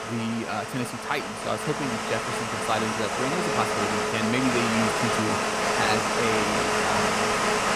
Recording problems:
household noises; very loud; throughout; 4 dB above the speech

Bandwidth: 15 kHz